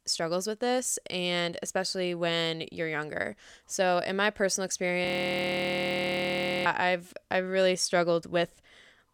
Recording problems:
audio freezing; at 5 s for 1.5 s

